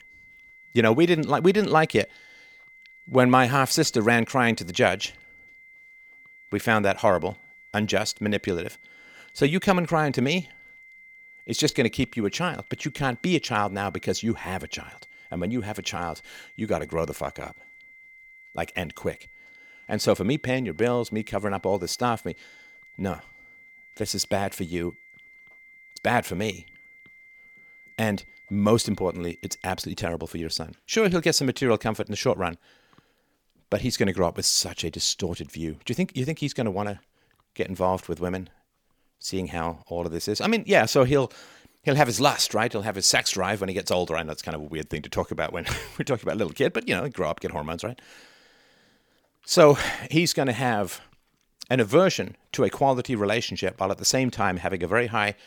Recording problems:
high-pitched whine; faint; until 30 s; 2 kHz, 25 dB below the speech

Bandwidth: 19 kHz